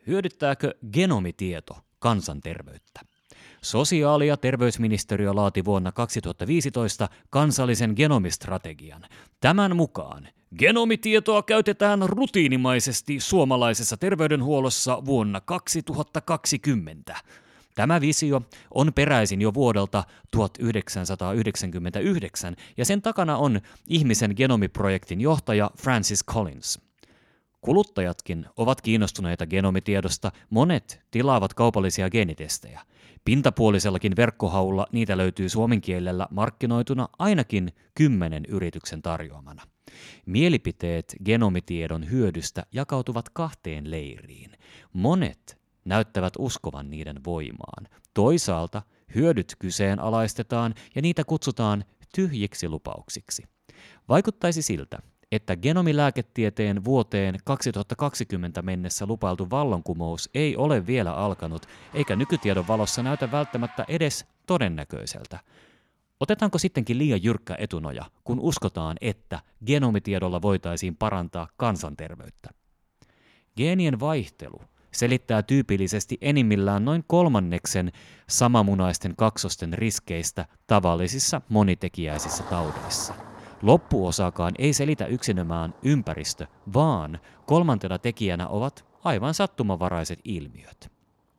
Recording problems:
traffic noise; noticeable; throughout; 20 dB below the speech

